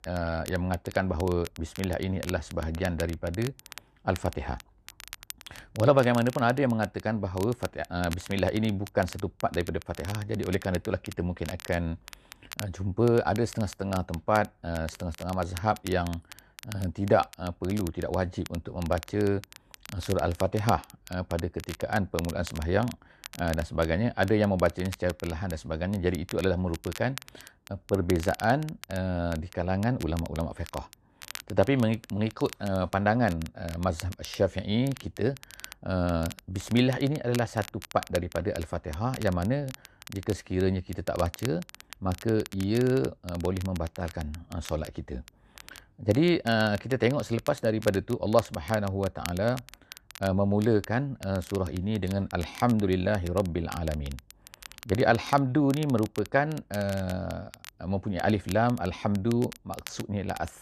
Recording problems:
crackle, like an old record; noticeable; 15 dB below the speech

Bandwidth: 14 kHz